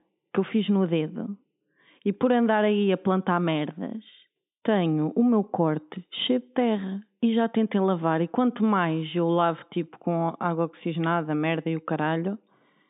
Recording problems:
high frequencies cut off; severe; nothing above 3.5 kHz

